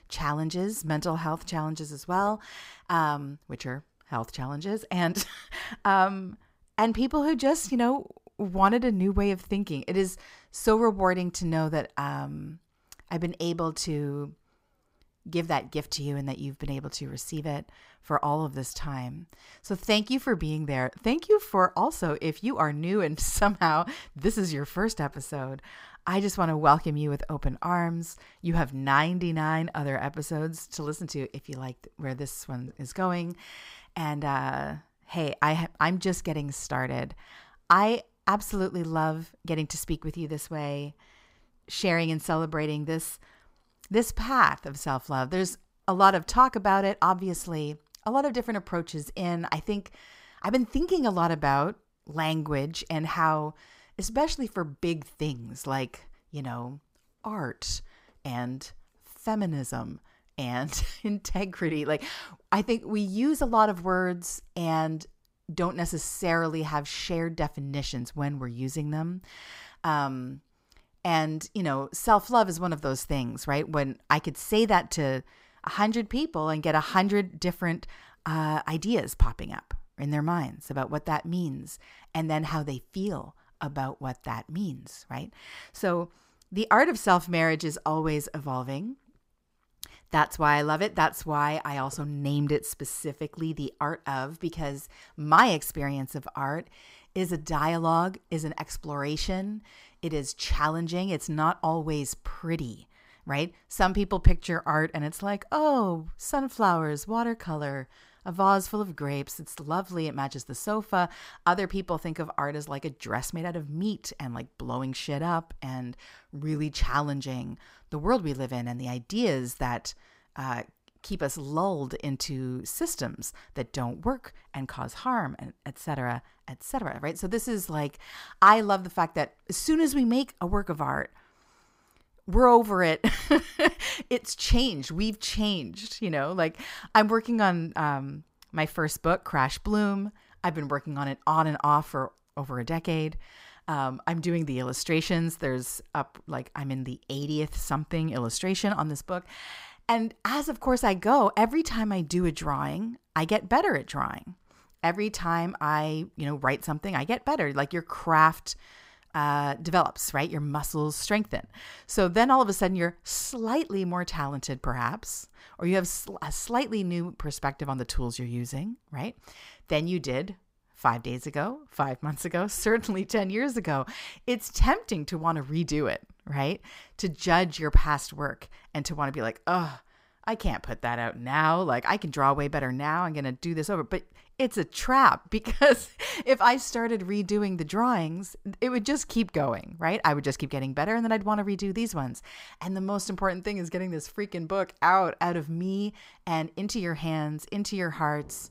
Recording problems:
none

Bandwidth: 15.5 kHz